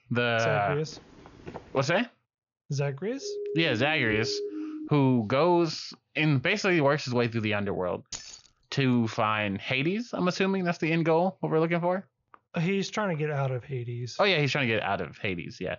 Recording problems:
high frequencies cut off; noticeable; nothing above 7 kHz
footsteps; faint; at 1 s; peak 15 dB below the speech
siren; noticeable; from 3 to 5 s; peak 7 dB below the speech
jangling keys; faint; at 8 s; peak 10 dB below the speech

